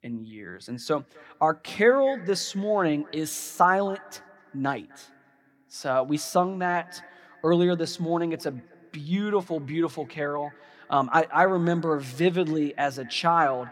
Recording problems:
echo of what is said; faint; throughout; 250 ms later, 25 dB below the speech

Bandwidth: 17.5 kHz